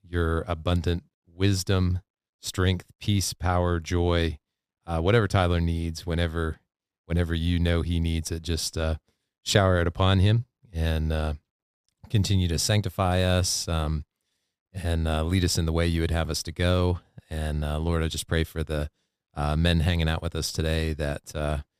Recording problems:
none

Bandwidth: 15 kHz